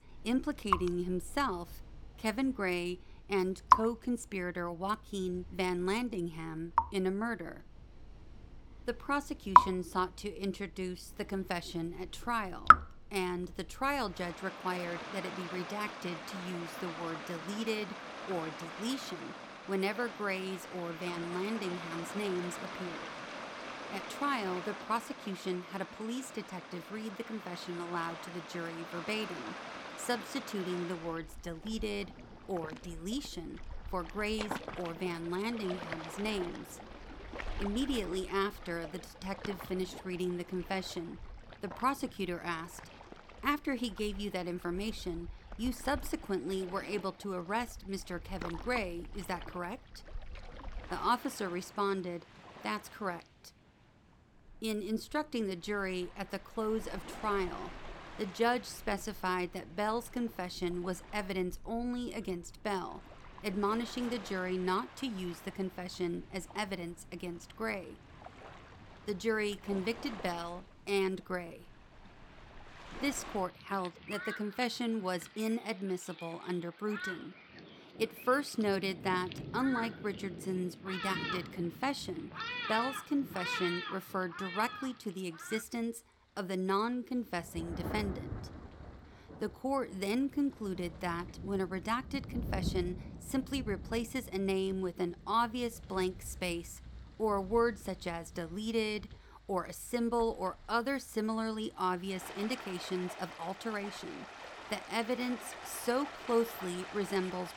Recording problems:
rain or running water; loud; throughout; 3 dB below the speech

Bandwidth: 17.5 kHz